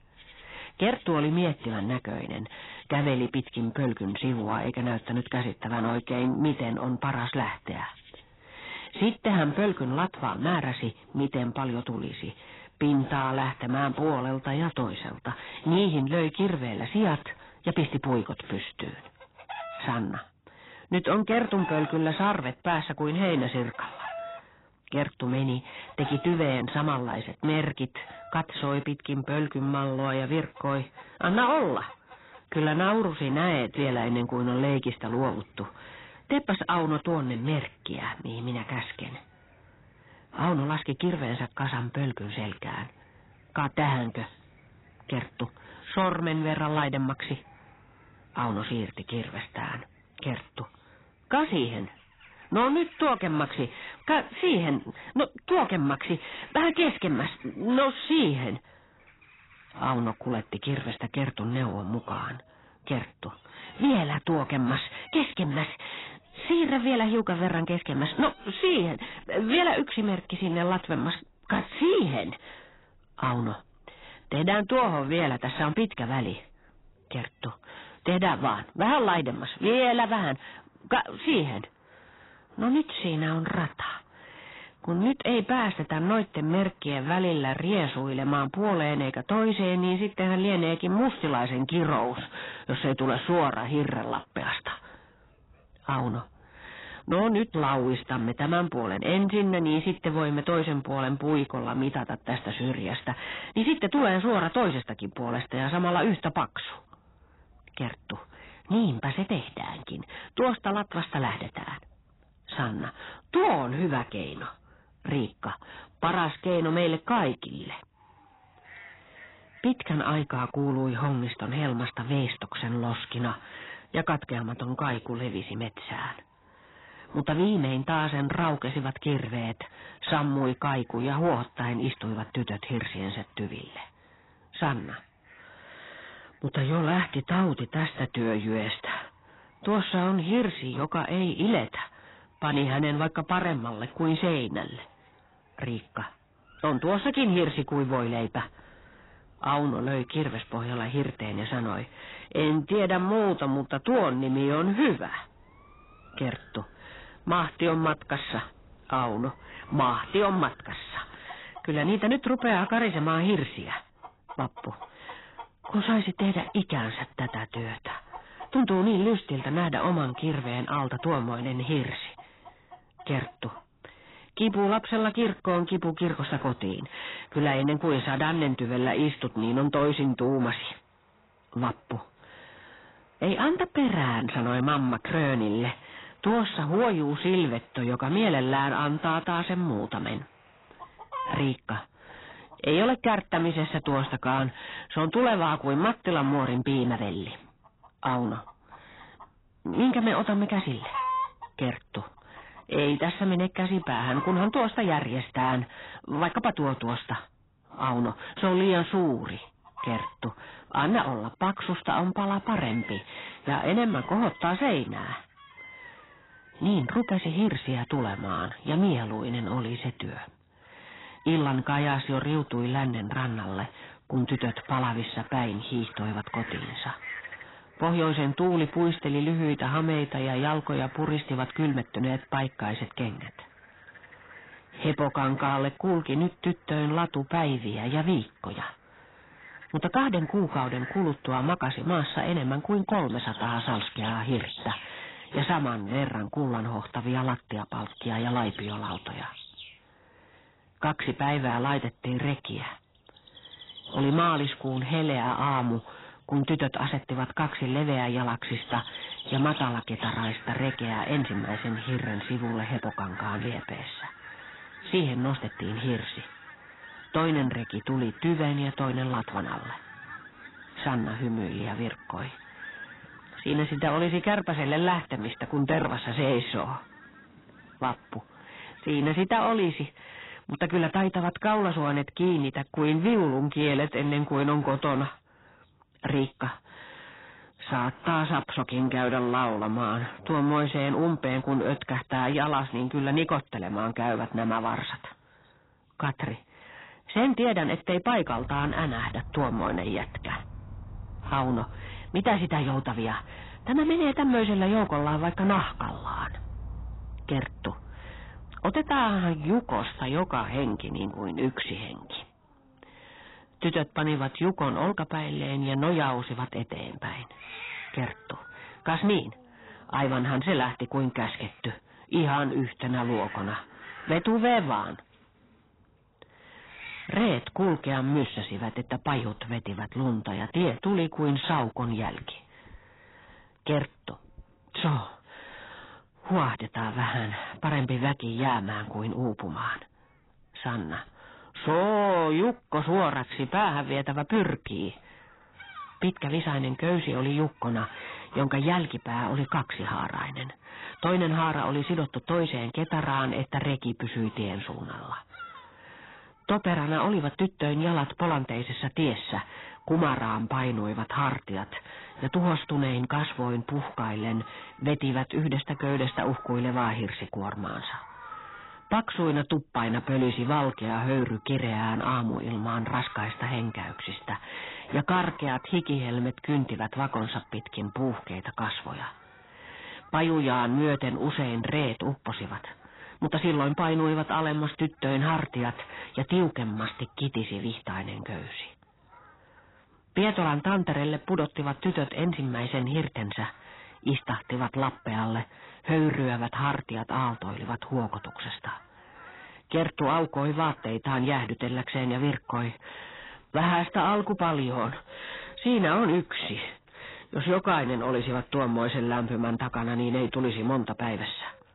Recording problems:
garbled, watery; badly; nothing above 4 kHz
distortion; slight; 10 dB below the speech
animal sounds; noticeable; throughout; 20 dB below the speech

